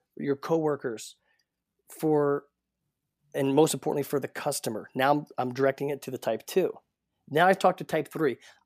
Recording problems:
none

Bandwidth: 15 kHz